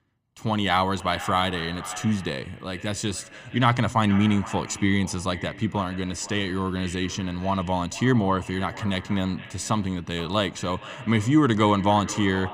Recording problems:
echo of what is said; noticeable; throughout; 470 ms later, 15 dB below the speech

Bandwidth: 15 kHz